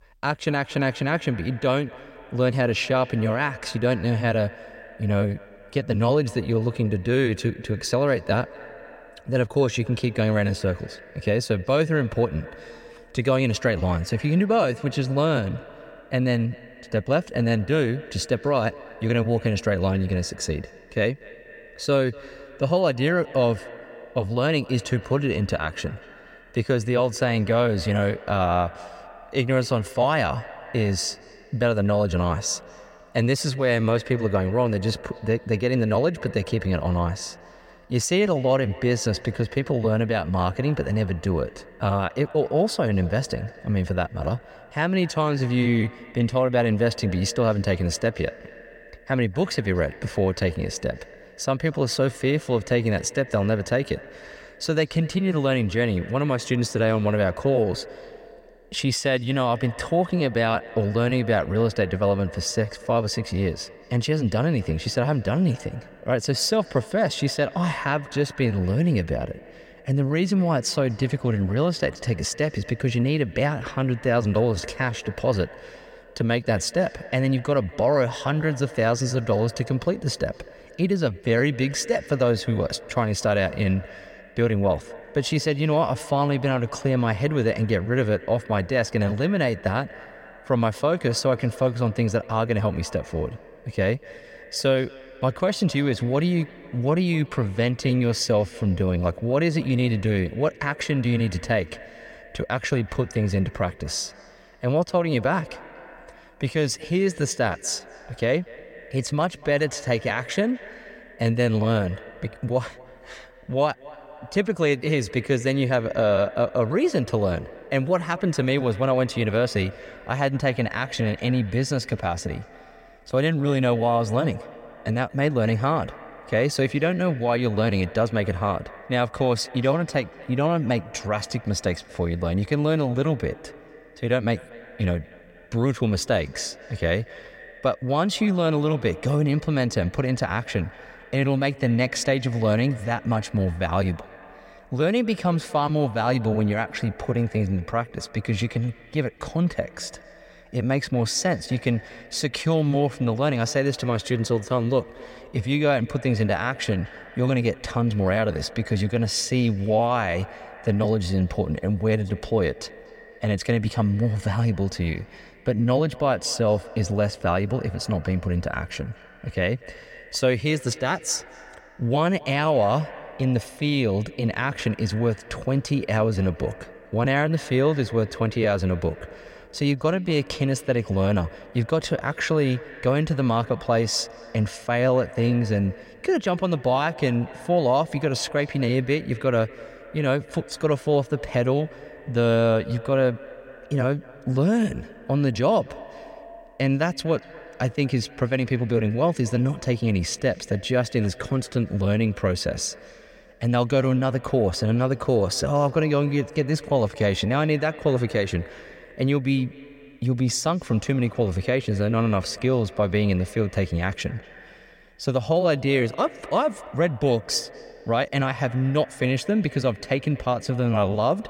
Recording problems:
echo of what is said; faint; throughout; 240 ms later, 20 dB below the speech

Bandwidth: 16 kHz